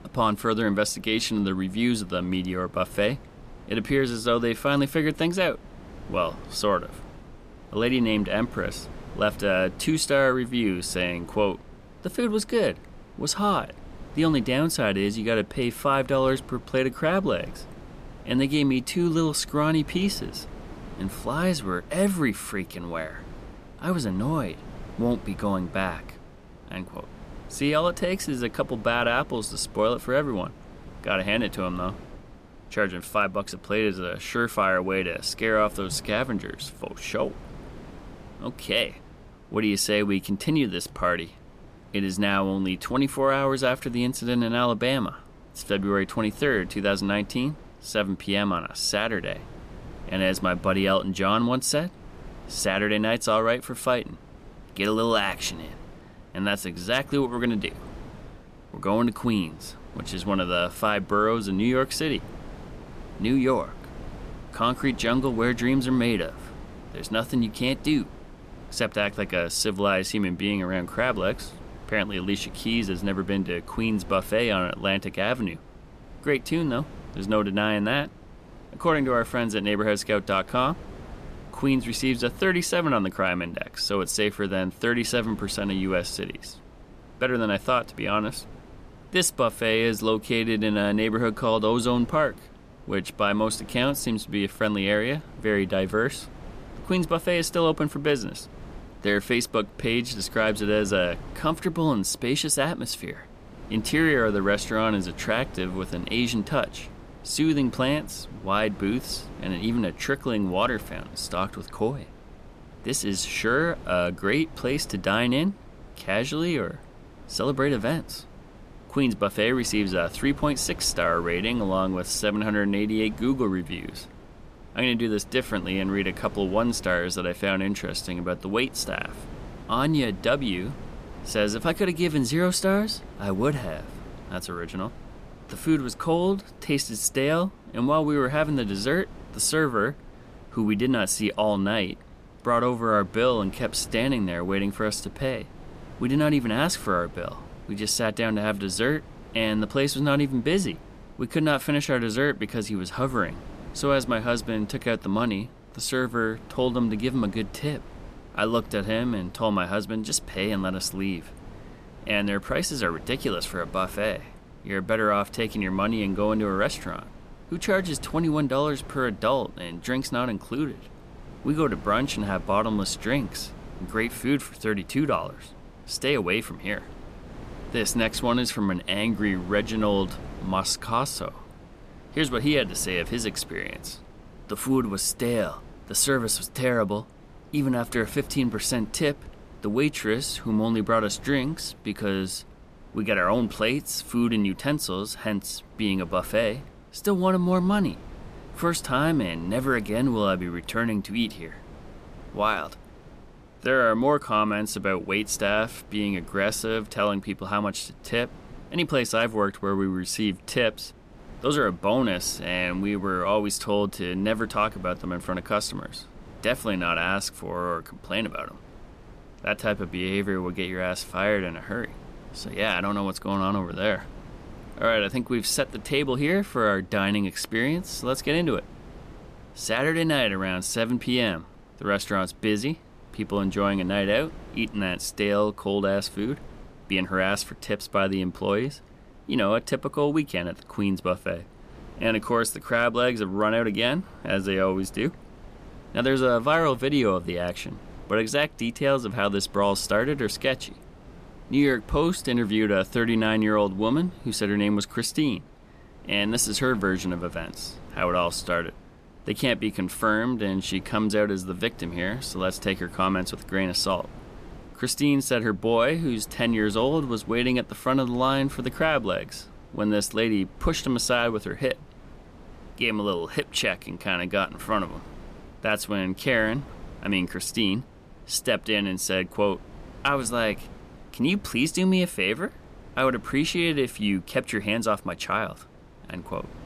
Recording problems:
wind noise on the microphone; occasional gusts; 25 dB below the speech

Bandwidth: 14.5 kHz